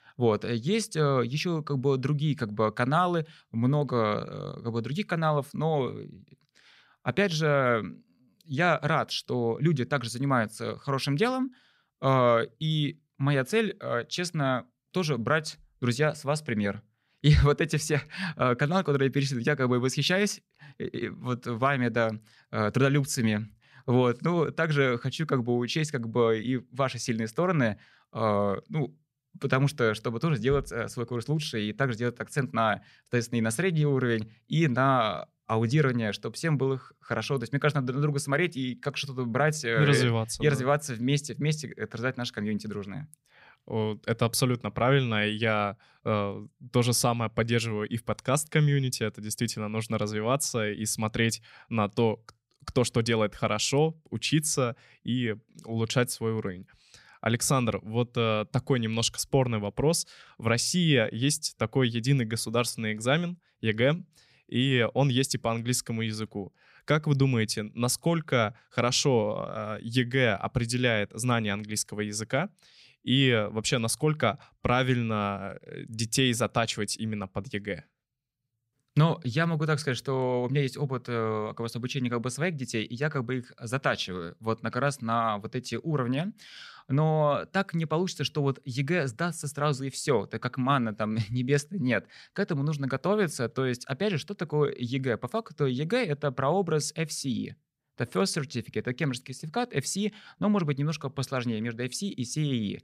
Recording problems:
none

